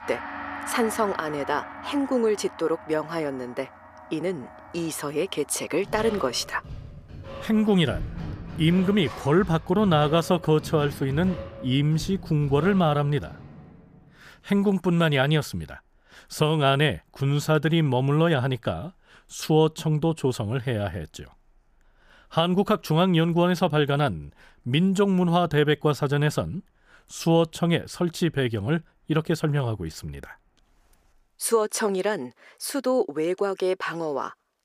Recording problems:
background music; noticeable; until 14 s; 15 dB below the speech

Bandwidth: 15 kHz